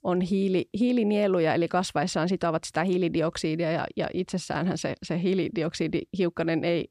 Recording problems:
none

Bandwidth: 15 kHz